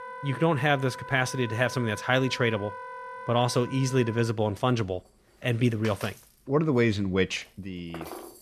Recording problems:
background music; noticeable; throughout; 15 dB below the speech

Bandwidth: 14 kHz